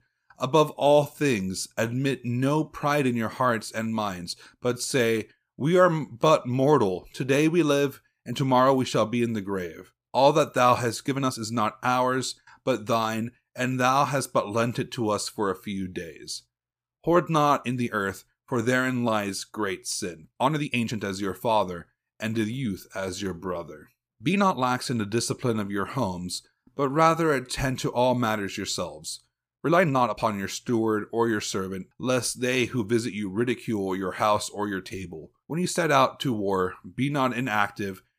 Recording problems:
uneven, jittery; strongly; from 0.5 to 36 s

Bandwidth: 15 kHz